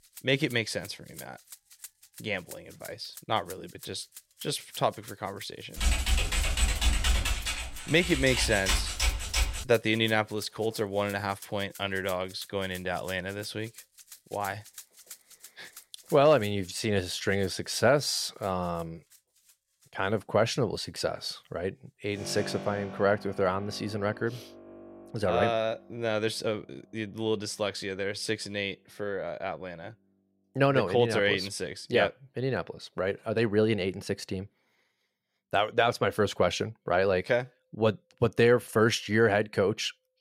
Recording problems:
background music; noticeable; throughout; 20 dB below the speech
keyboard typing; loud; from 6 to 9.5 s; peak 2 dB above the speech

